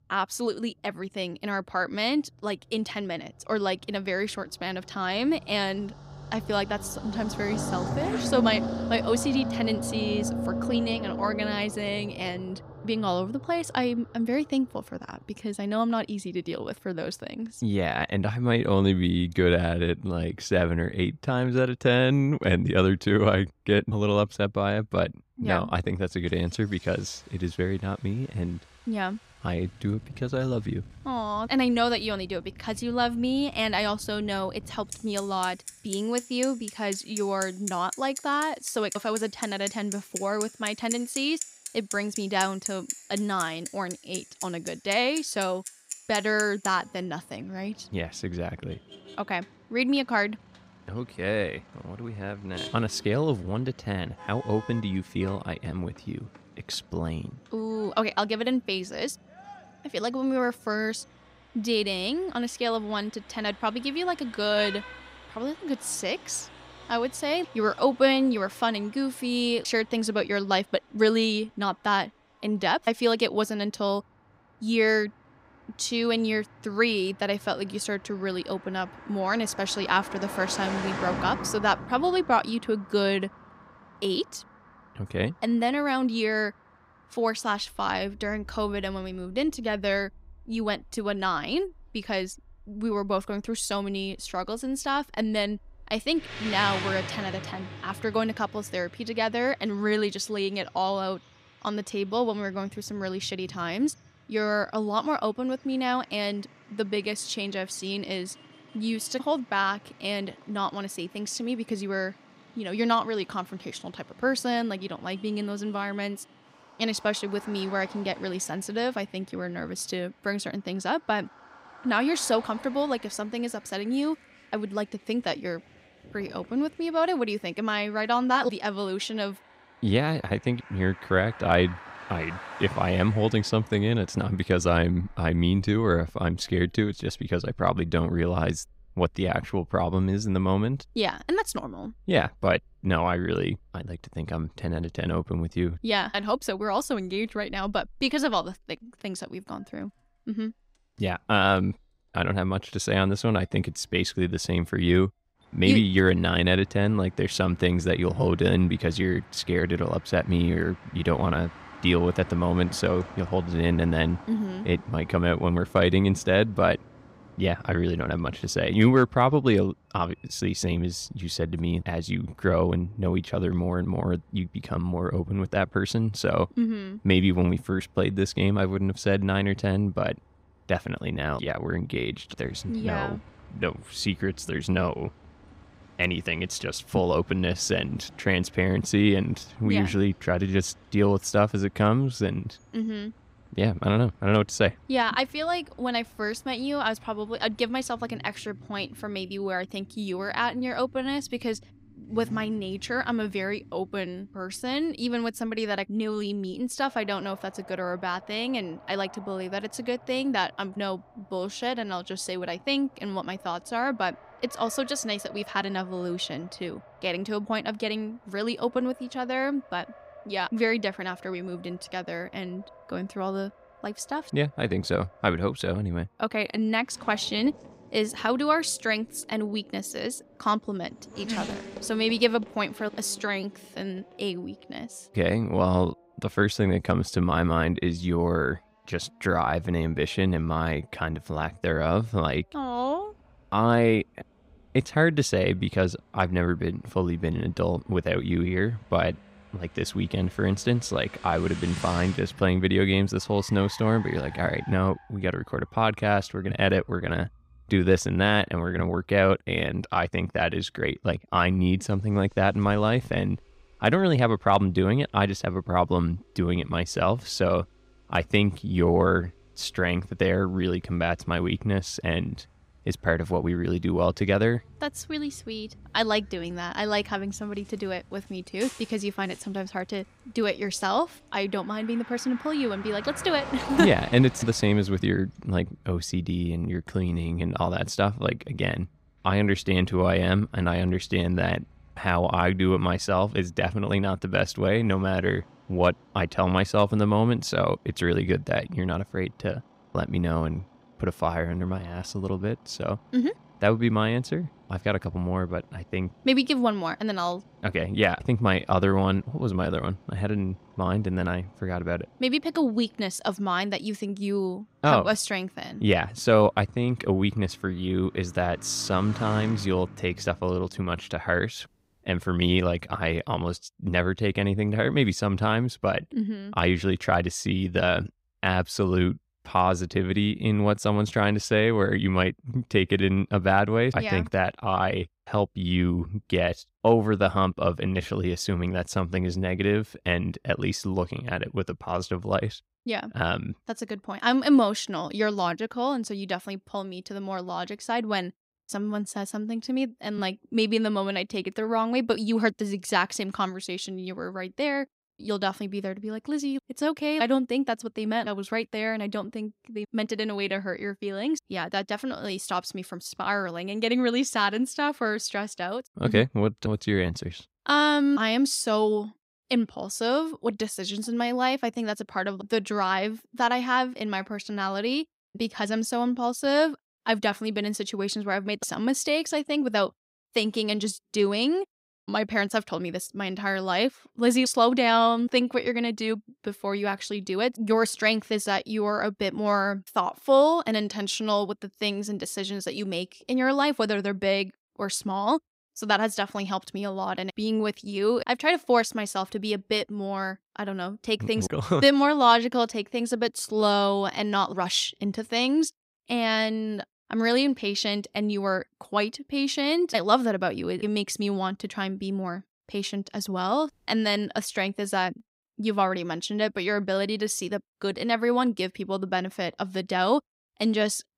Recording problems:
traffic noise; noticeable; until 5:21; 15 dB below the speech

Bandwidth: 15.5 kHz